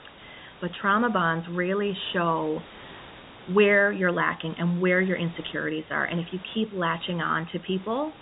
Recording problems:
high frequencies cut off; severe; nothing above 4 kHz
hiss; faint; throughout; 20 dB below the speech

